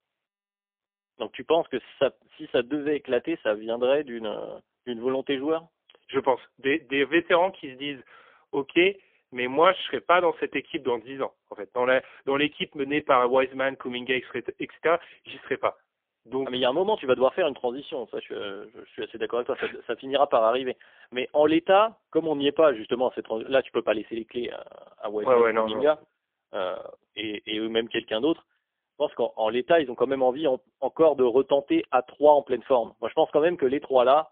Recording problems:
phone-call audio; poor line; nothing above 3.5 kHz

